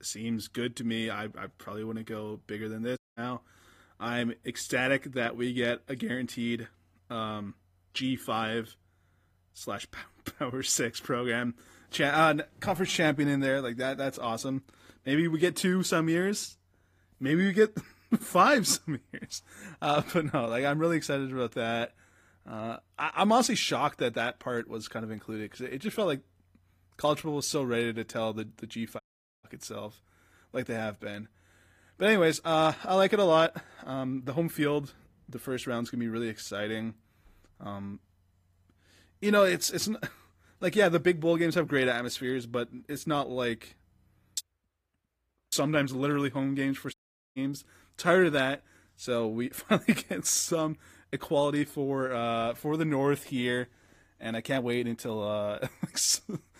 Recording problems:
garbled, watery; slightly; nothing above 15 kHz
audio cutting out; at 3 s, at 29 s and at 47 s

